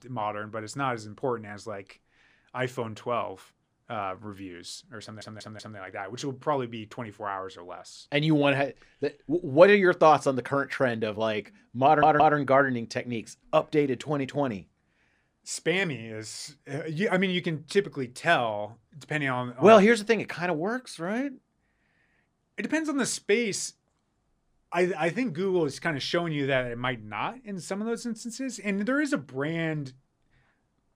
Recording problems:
audio stuttering; at 5 s and at 12 s

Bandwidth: 15 kHz